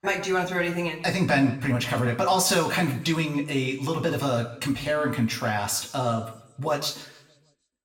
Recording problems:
room echo; slight; dies away in 0.7 s
off-mic speech; somewhat distant

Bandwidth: 16.5 kHz